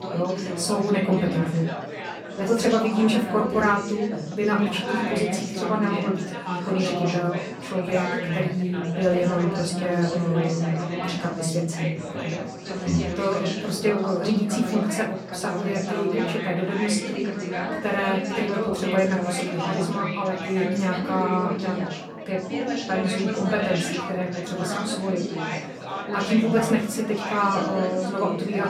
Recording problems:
off-mic speech; far
room echo; slight; dies away in 0.3 s
chatter from many people; loud; throughout; 4 dB below the speech

